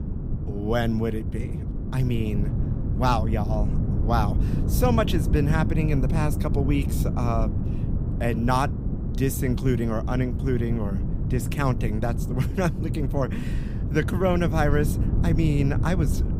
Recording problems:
wind noise on the microphone; heavy; 9 dB below the speech

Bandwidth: 15.5 kHz